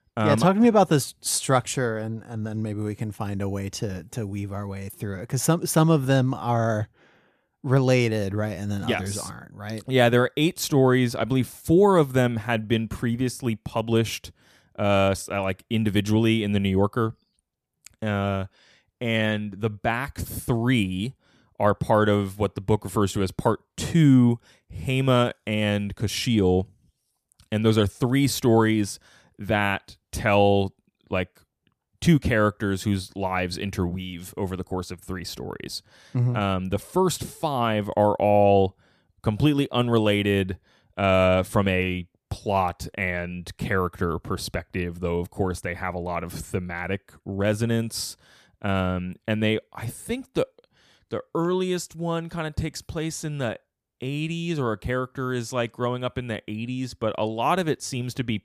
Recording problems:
none

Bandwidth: 14.5 kHz